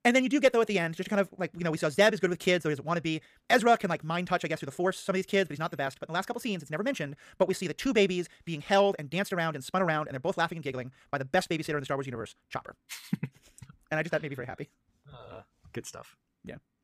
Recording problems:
wrong speed, natural pitch; too fast; 1.8 times normal speed

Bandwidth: 15 kHz